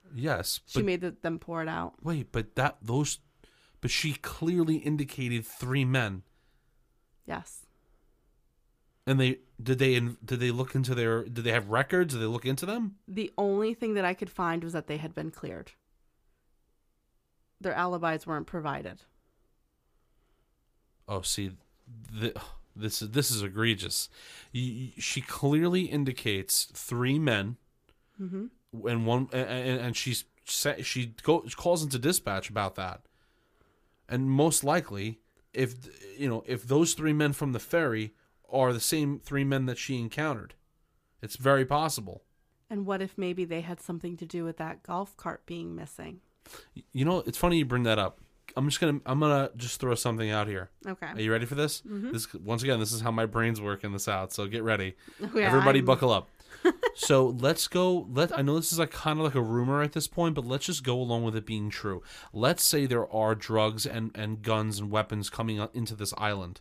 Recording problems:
none

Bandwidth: 15 kHz